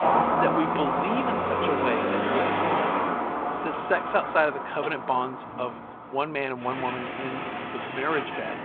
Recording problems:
phone-call audio
traffic noise; very loud; throughout; 2 dB above the speech

